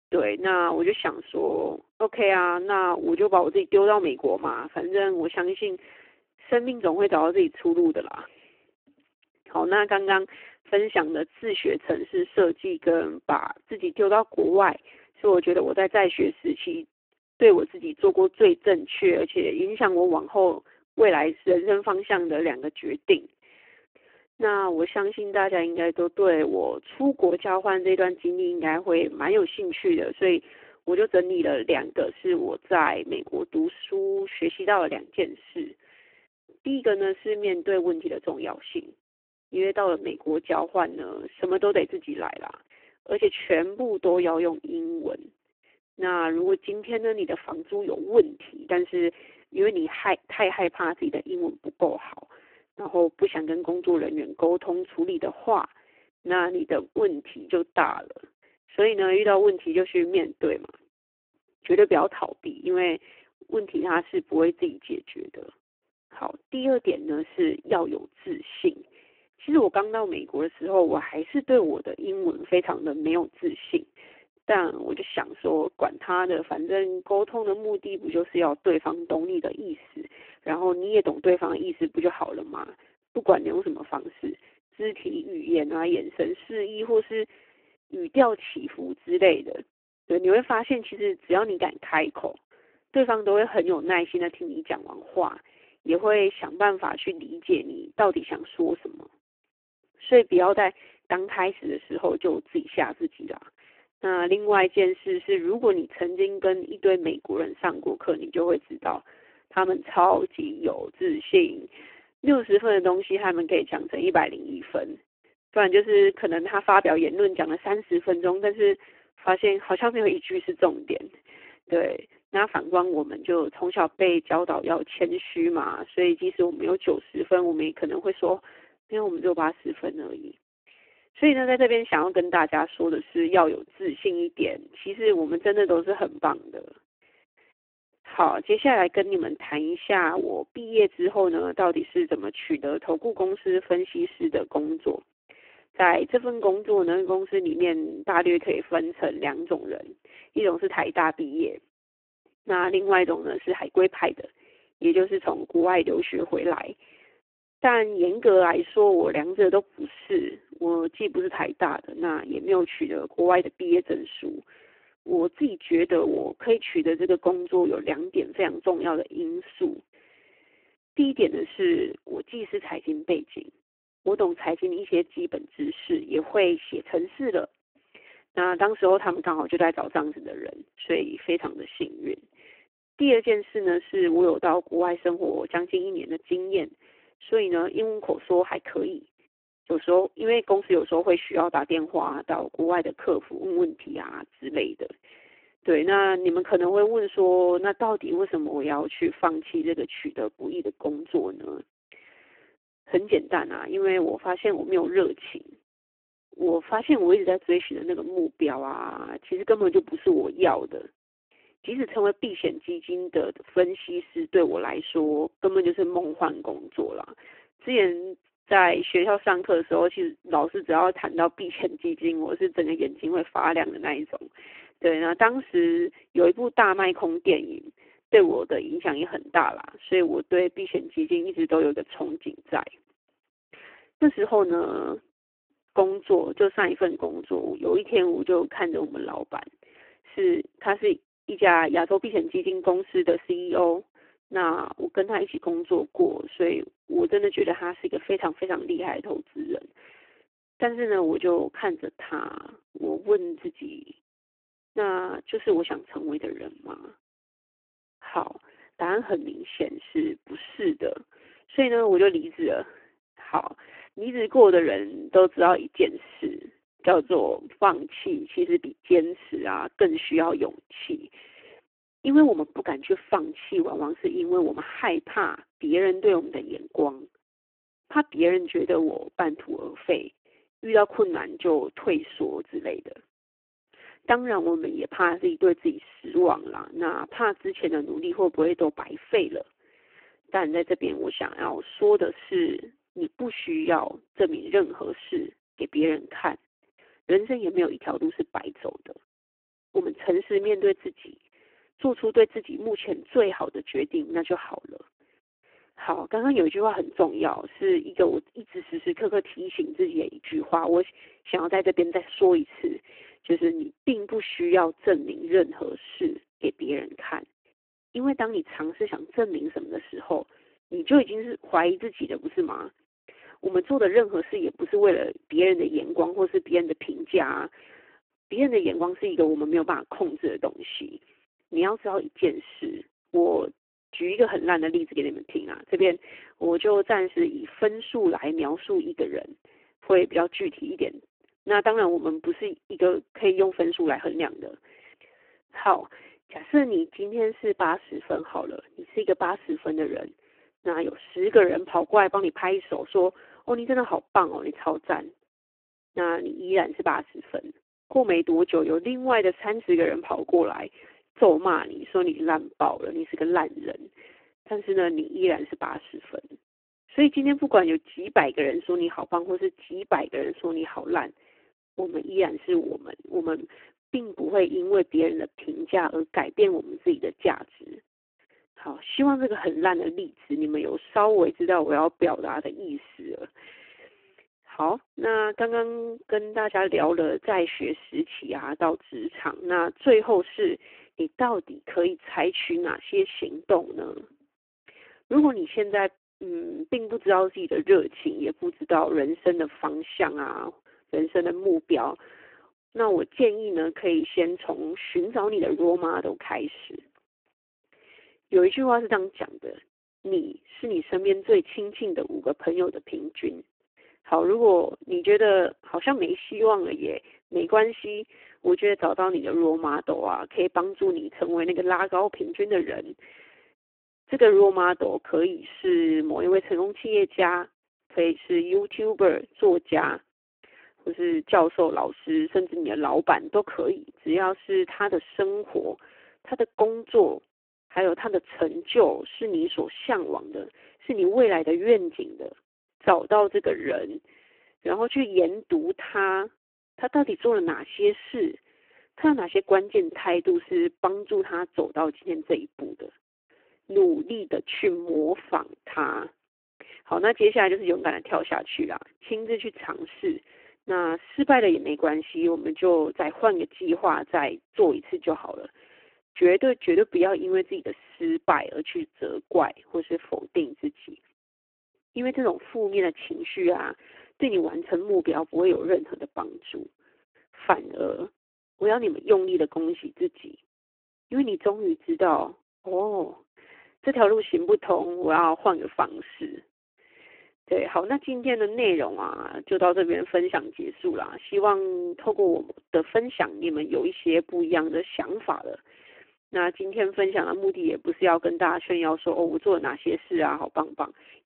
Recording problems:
phone-call audio; poor line

